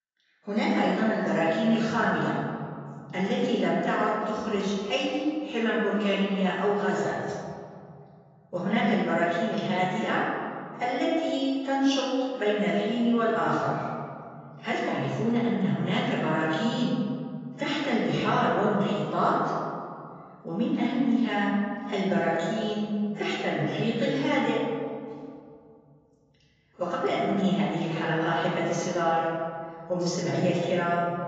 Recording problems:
off-mic speech; far
garbled, watery; badly; nothing above 7.5 kHz
room echo; noticeable; dies away in 2.4 s

